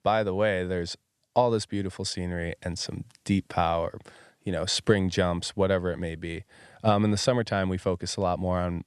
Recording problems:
none

